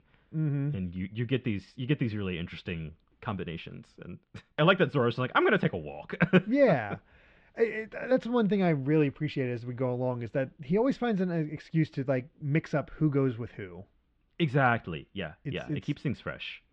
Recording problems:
muffled; very; fading above 3 kHz

